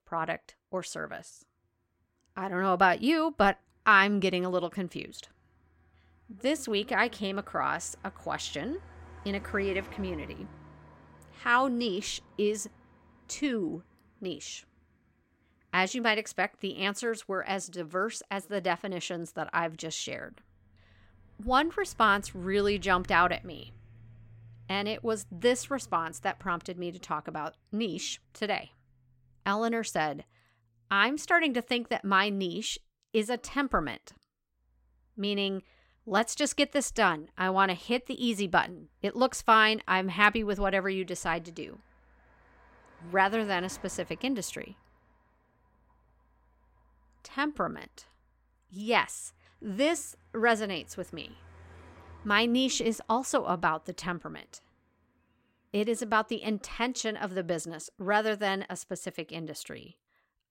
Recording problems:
traffic noise; faint; throughout; 25 dB below the speech

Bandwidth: 16 kHz